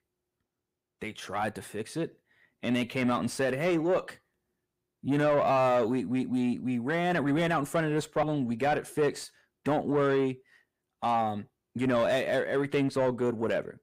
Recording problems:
distortion; slight; 10 dB below the speech

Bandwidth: 15.5 kHz